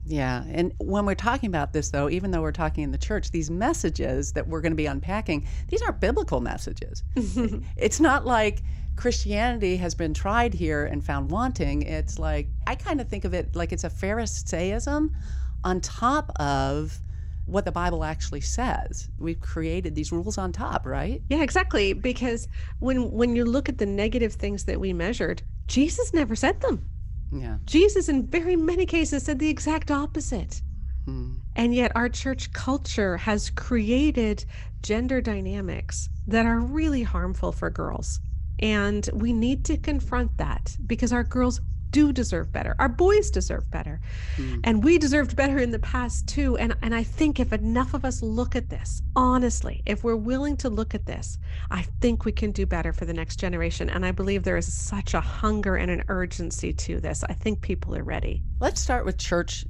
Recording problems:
low rumble; faint; throughout; 25 dB below the speech

